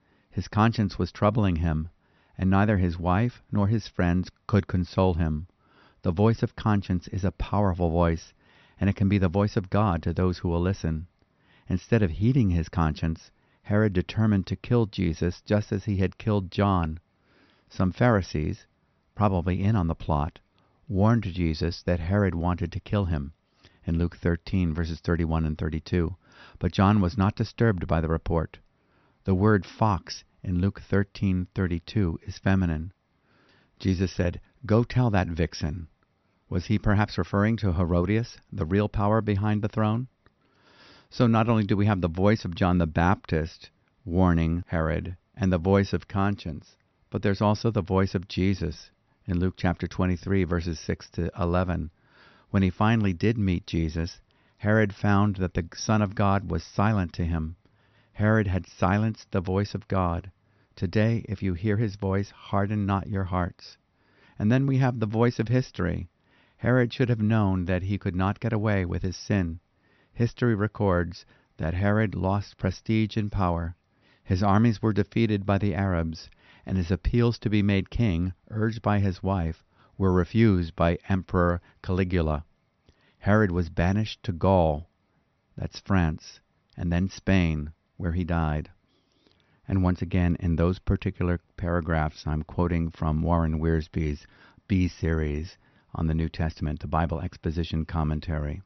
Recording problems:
high frequencies cut off; noticeable; nothing above 6 kHz

